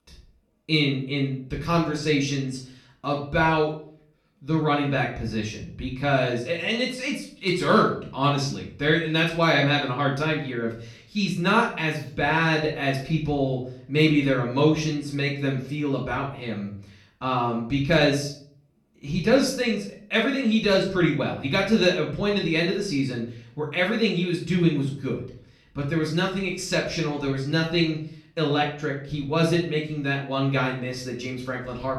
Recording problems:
off-mic speech; far
room echo; slight; dies away in 0.4 s

